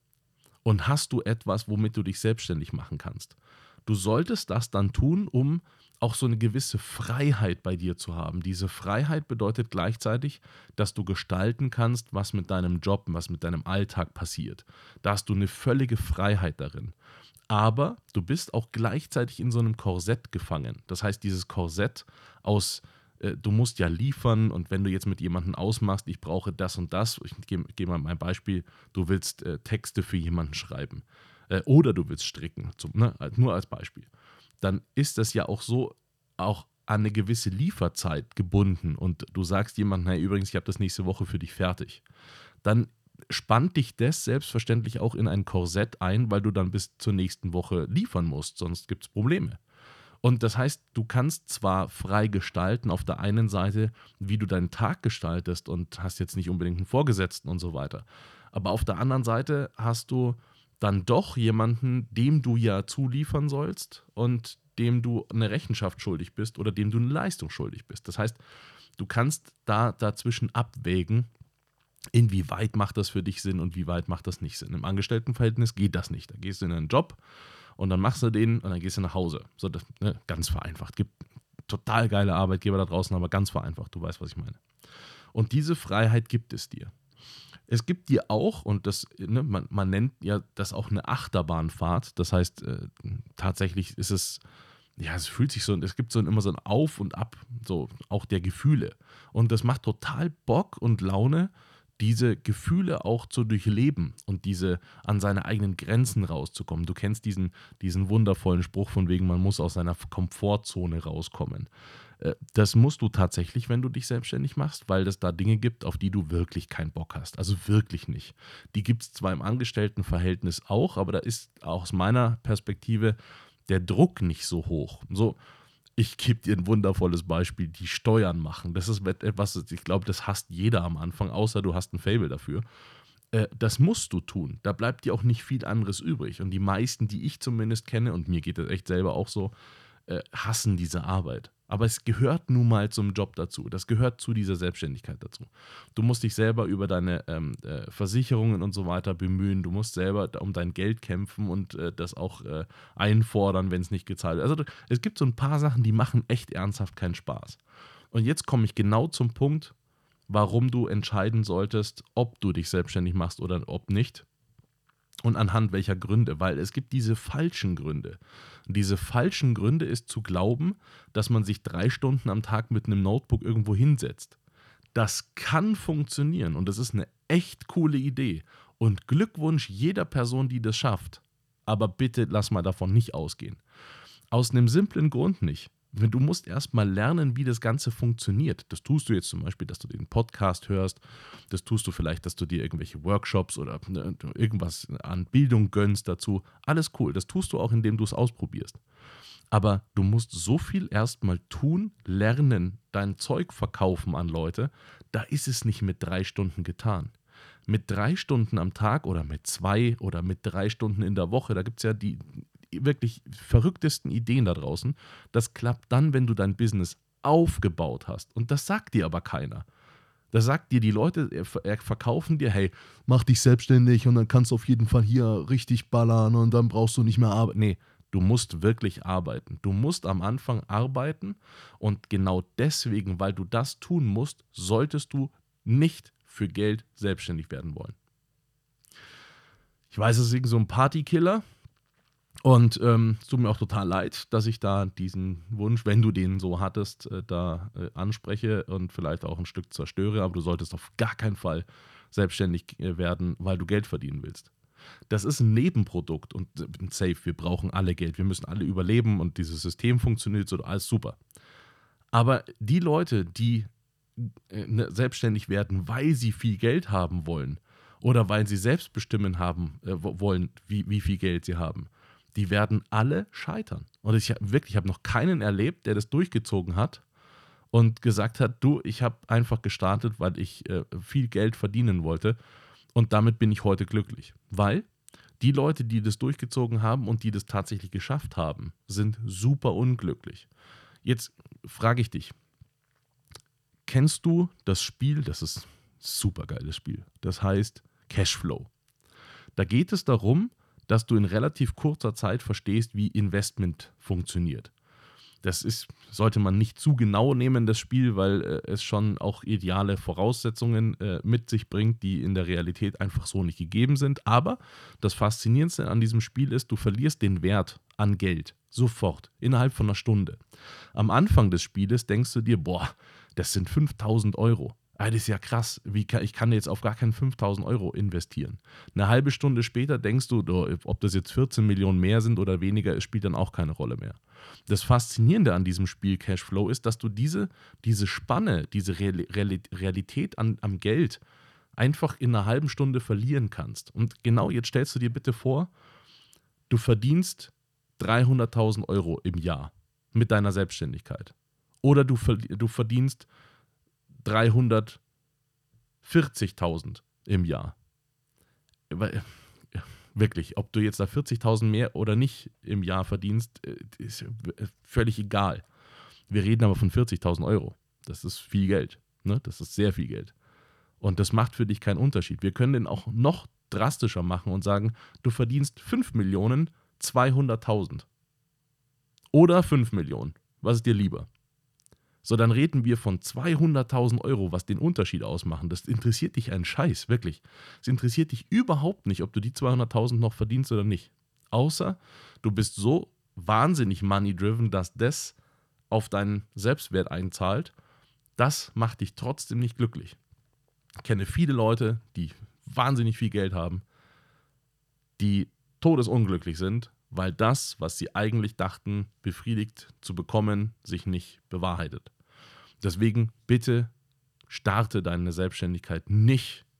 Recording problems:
none

